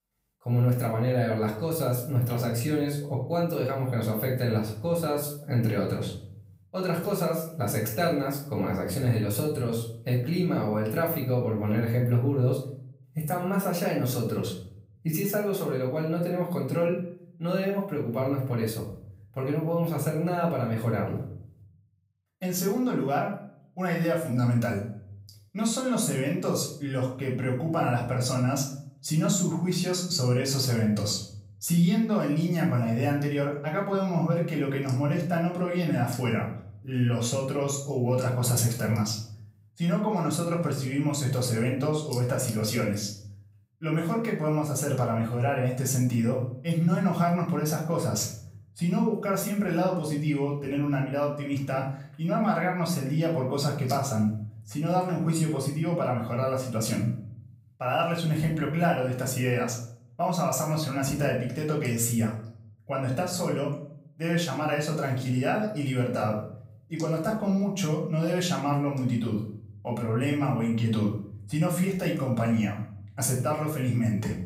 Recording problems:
off-mic speech; far
room echo; slight; dies away in 0.5 s

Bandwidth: 15.5 kHz